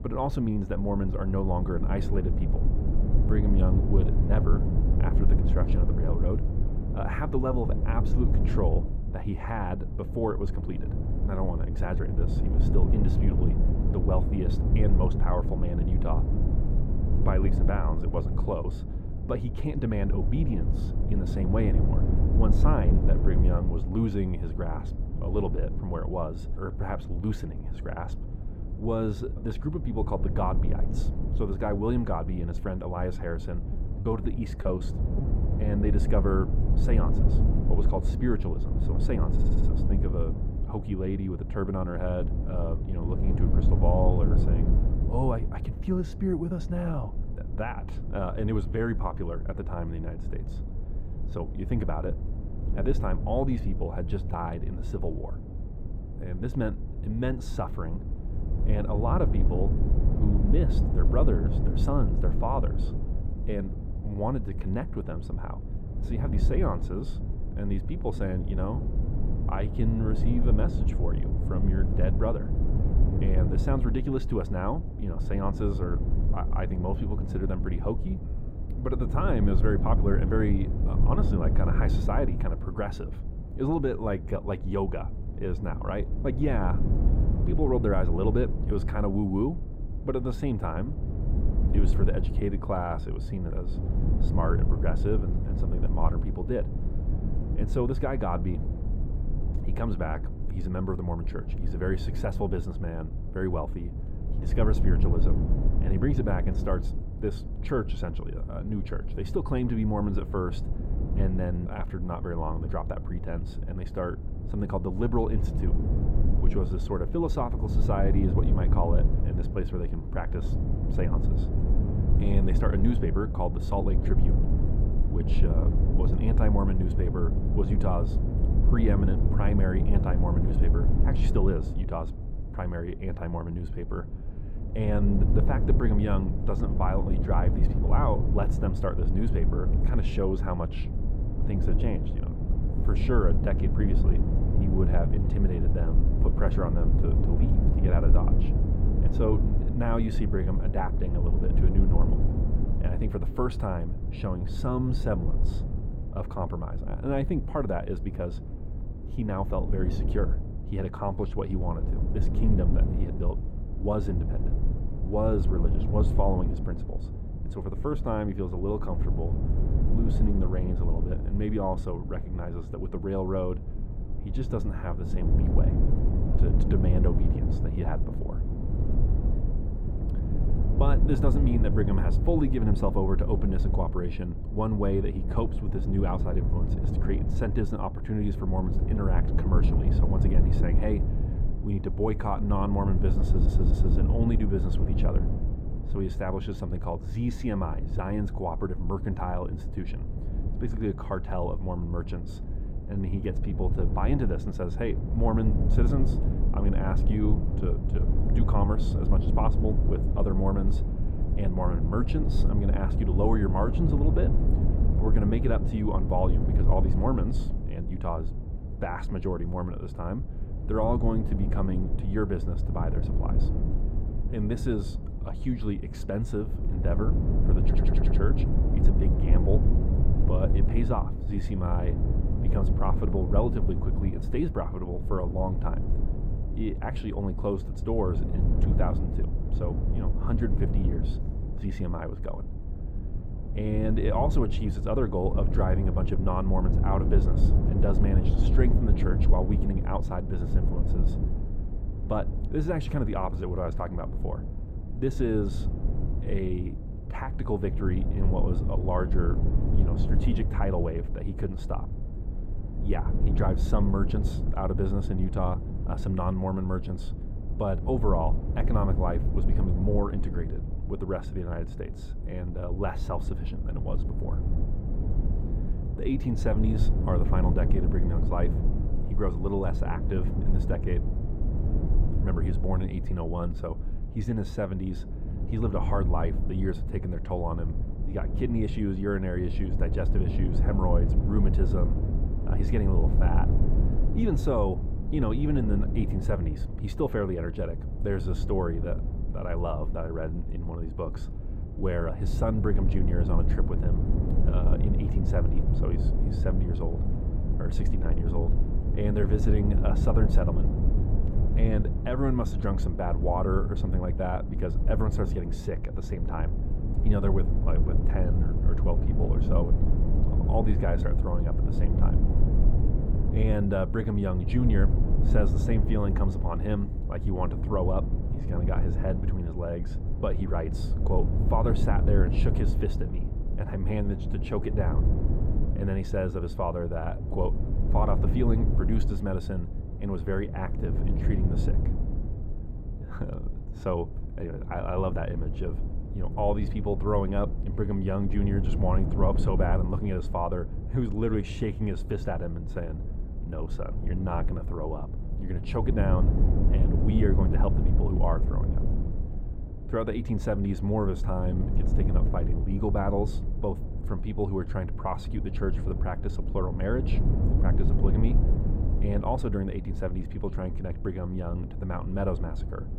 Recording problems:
muffled; very; fading above 2 kHz
low rumble; loud; throughout; 7 dB below the speech
choppy; very; at 34 s; 7% of the speech affected
audio stuttering; at 39 s, at 3:13 and at 3:48

